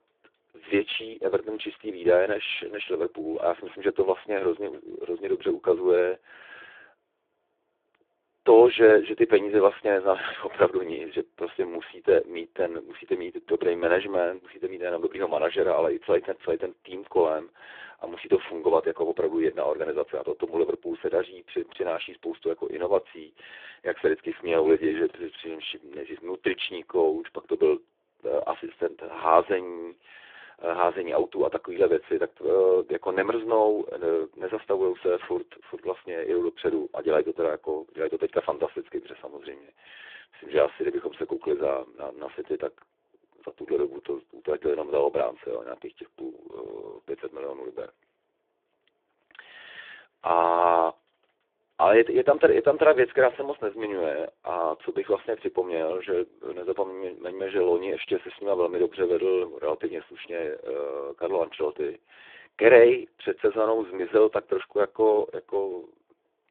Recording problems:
phone-call audio; poor line

